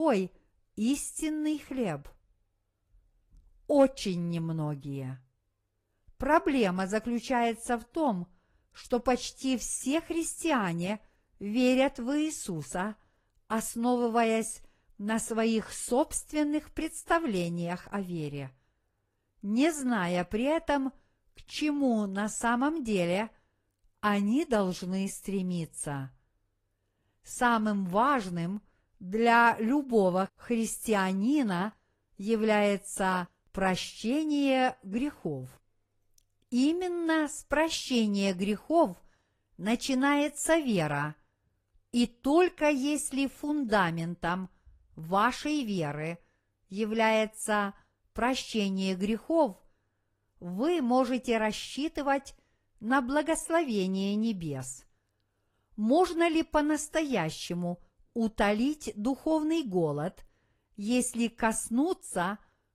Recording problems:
garbled, watery; slightly; nothing above 14.5 kHz
abrupt cut into speech; at the start

